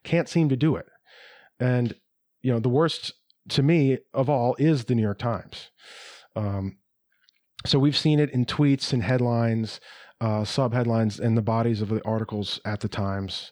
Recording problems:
none

